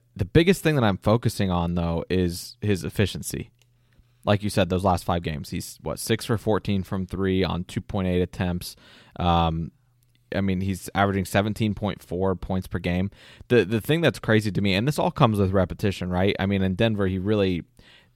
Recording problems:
none

